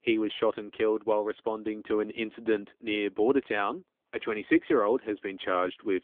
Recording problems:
phone-call audio; nothing above 3.5 kHz

